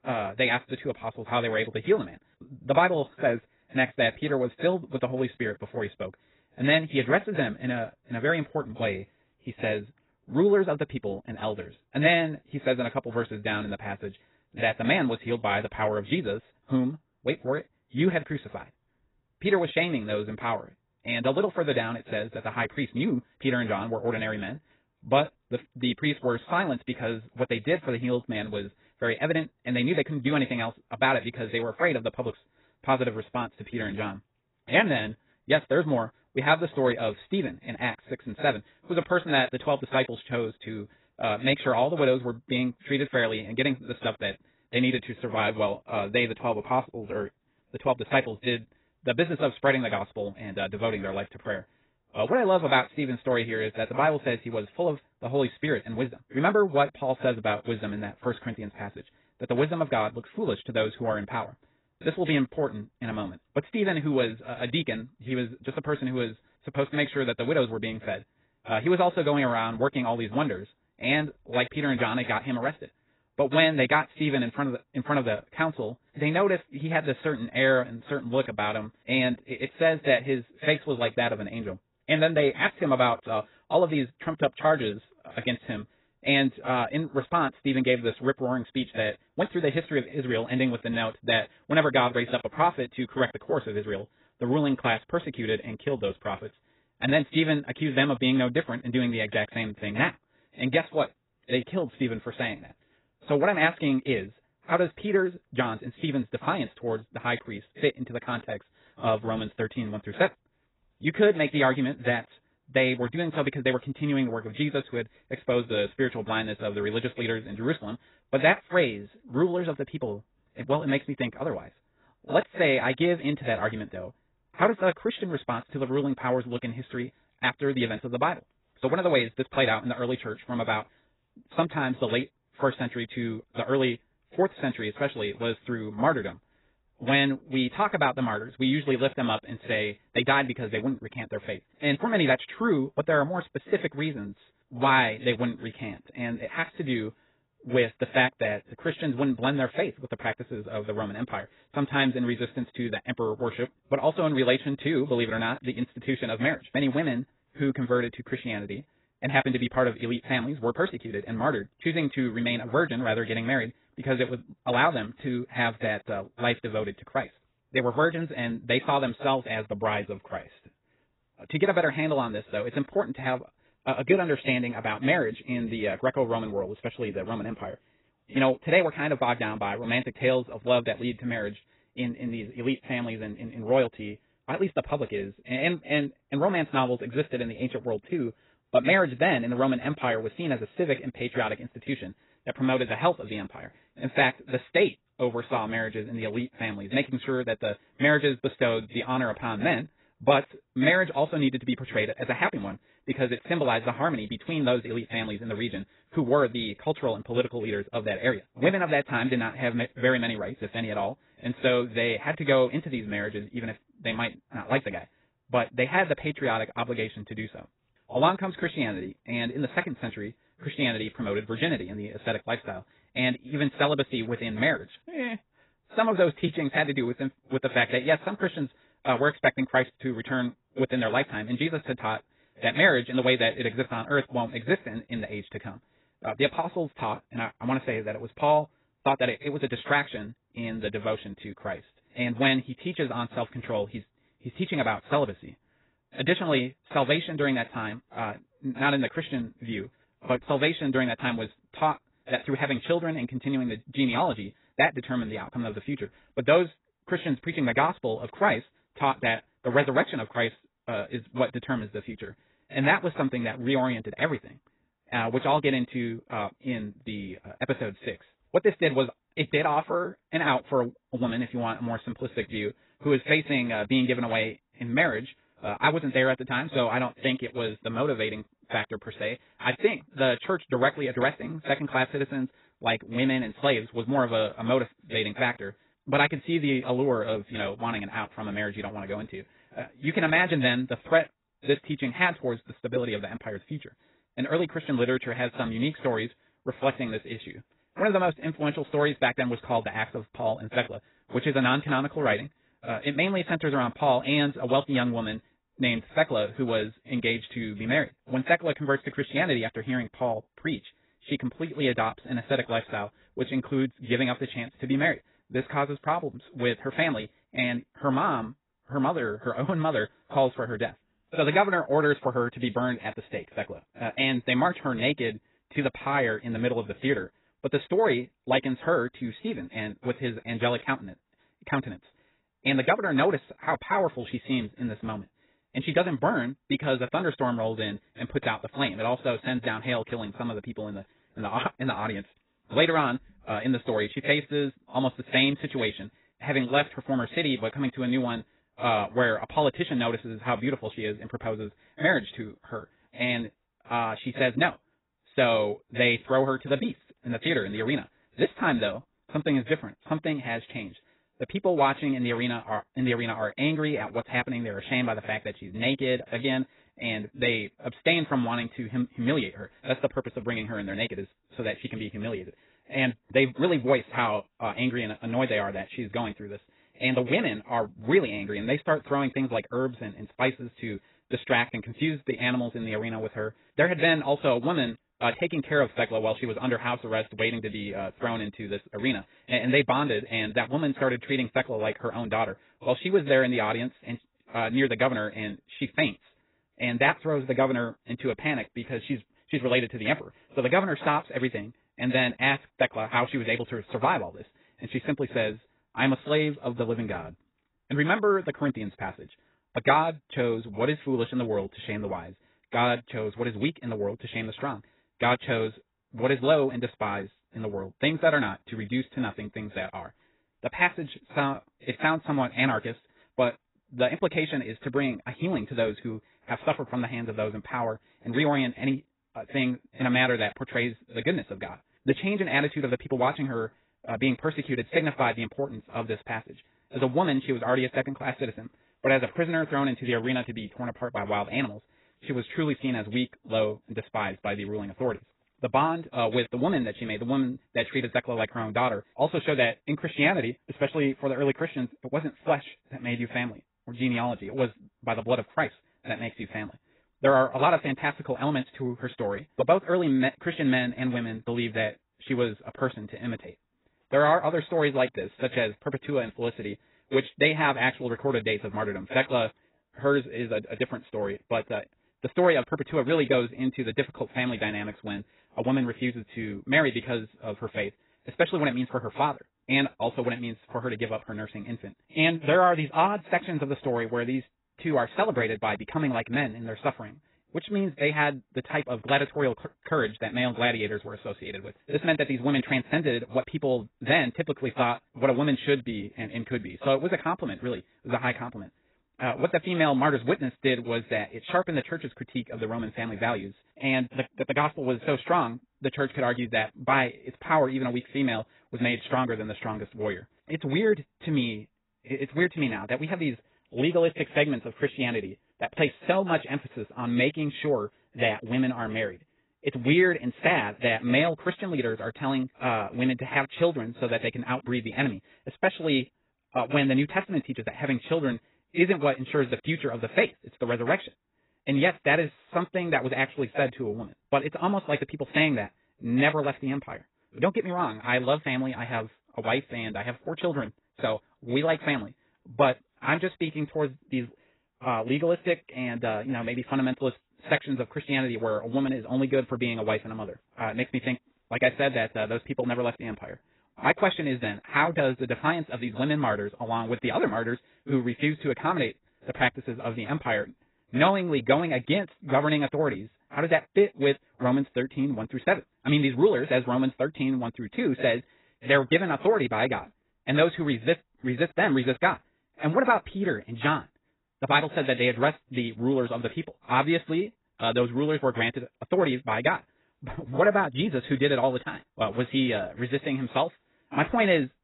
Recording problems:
garbled, watery; badly; nothing above 4 kHz
wrong speed, natural pitch; too fast; 1.6 times normal speed

